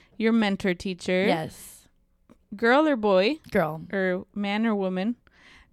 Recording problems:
none

